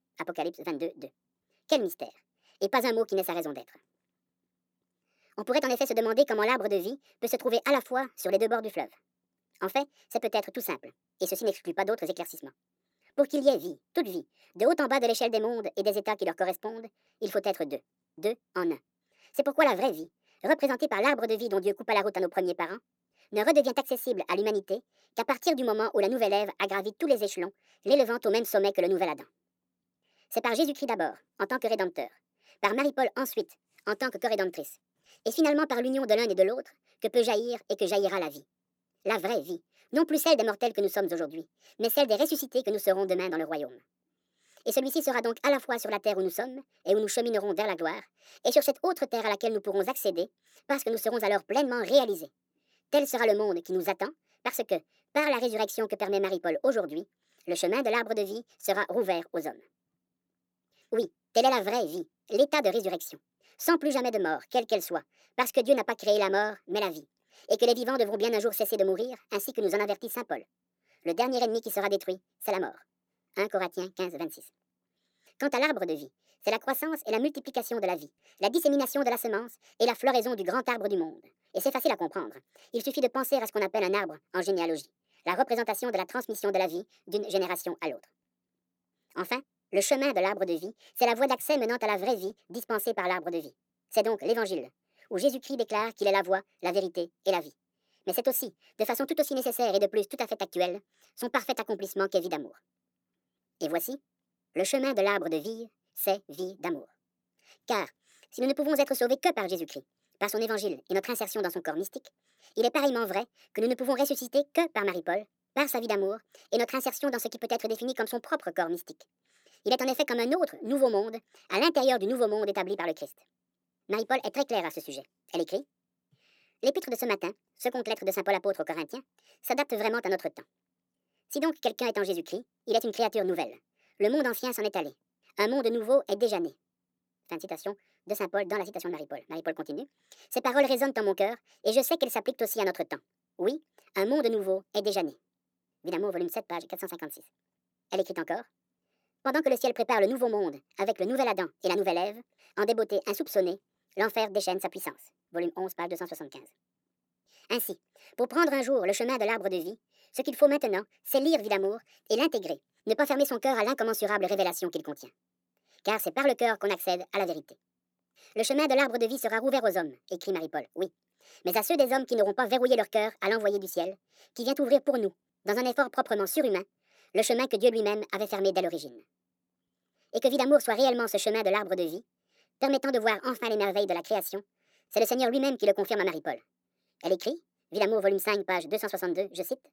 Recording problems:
wrong speed and pitch; too fast and too high; 1.5 times normal speed

